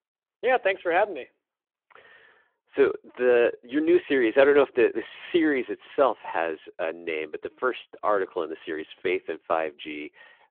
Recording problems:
muffled; very; fading above 3 kHz
phone-call audio

